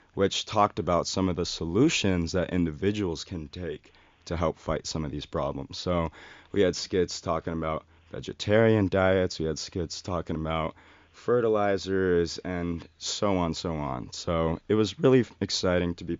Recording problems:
high frequencies cut off; noticeable; nothing above 7 kHz

